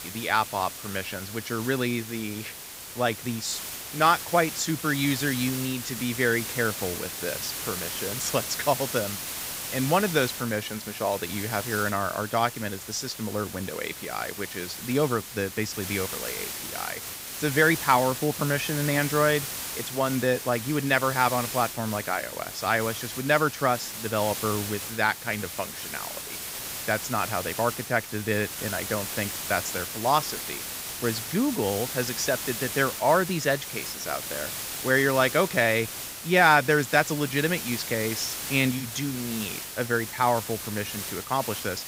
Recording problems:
hiss; loud; throughout; 6 dB below the speech

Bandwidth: 15.5 kHz